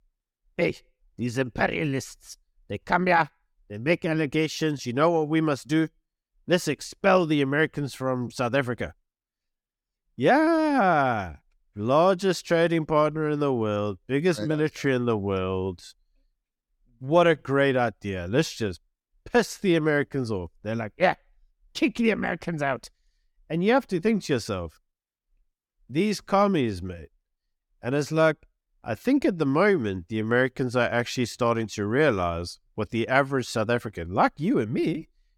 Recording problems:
none

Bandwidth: 17.5 kHz